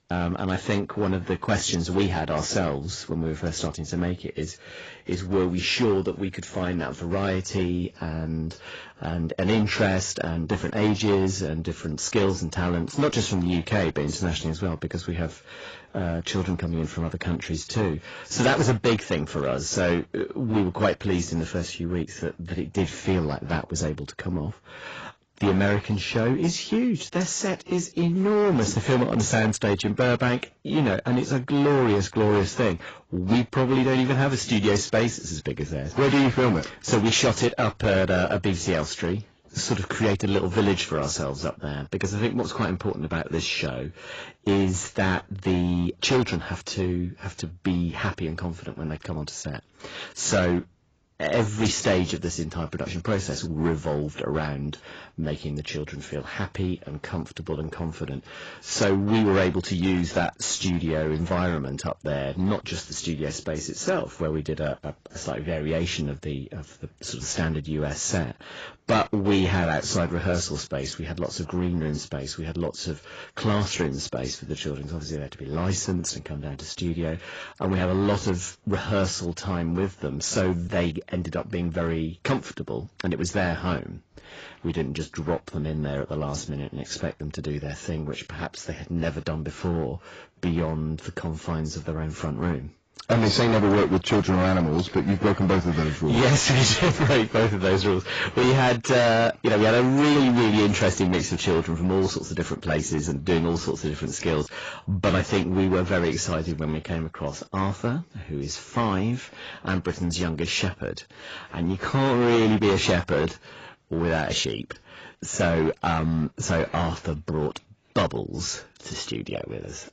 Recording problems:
distortion; heavy; 7% of the sound clipped
garbled, watery; badly; nothing above 7.5 kHz

